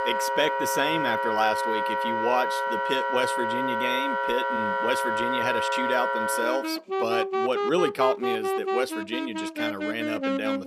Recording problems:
background music; very loud; throughout; 2 dB above the speech

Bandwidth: 14.5 kHz